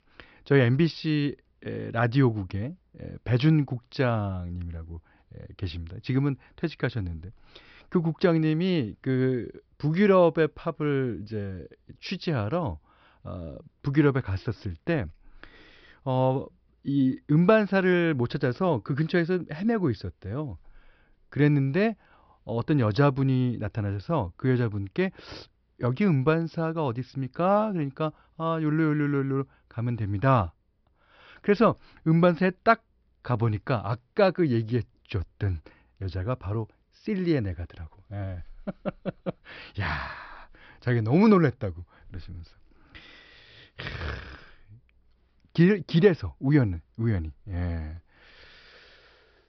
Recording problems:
high frequencies cut off; noticeable; nothing above 5.5 kHz

